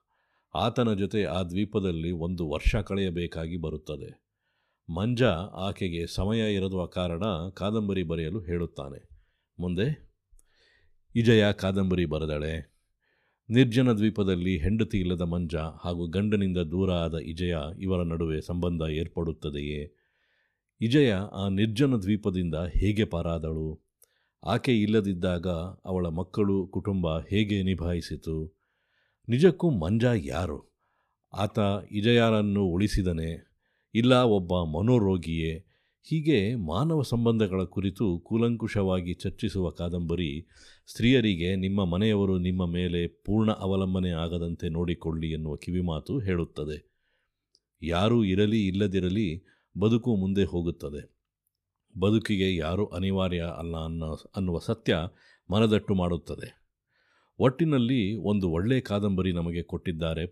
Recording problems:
none

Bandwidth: 14.5 kHz